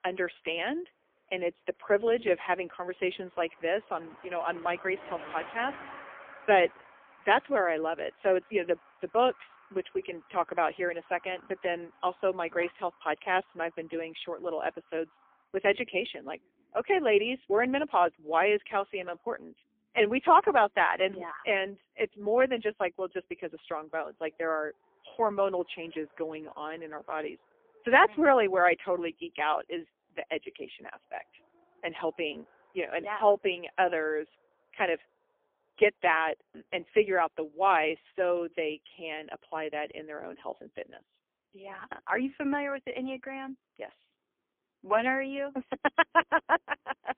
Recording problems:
phone-call audio; poor line; nothing above 3 kHz
traffic noise; faint; throughout; 25 dB below the speech

